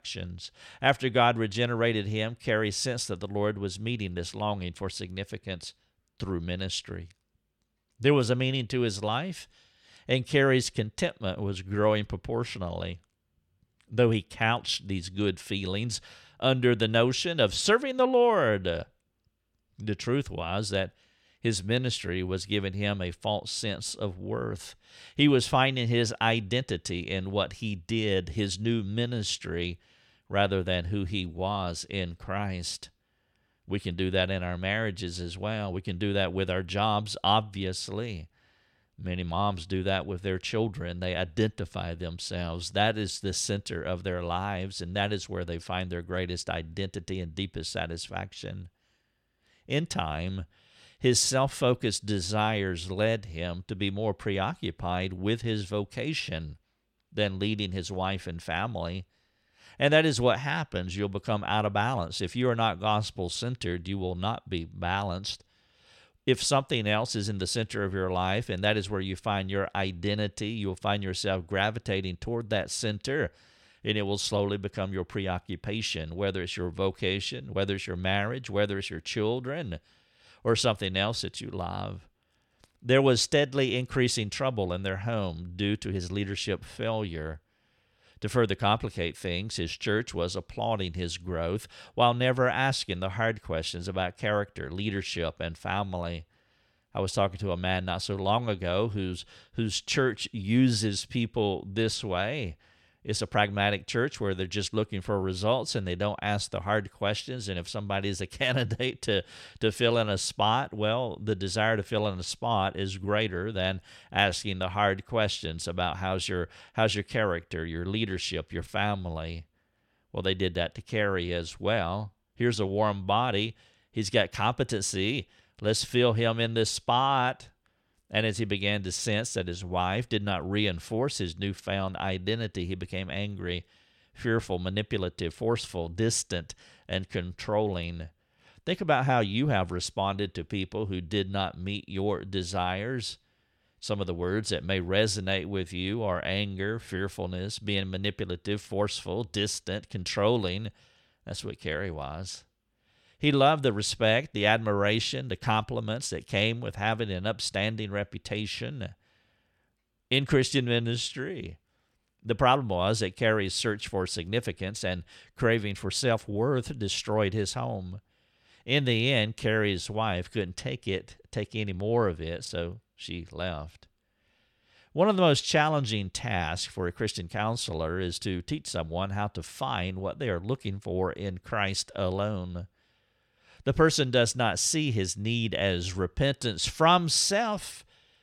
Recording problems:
none

